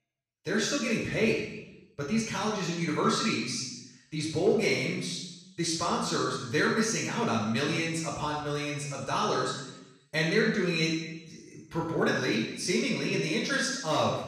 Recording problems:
off-mic speech; far
room echo; noticeable; dies away in 0.9 s

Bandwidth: 14.5 kHz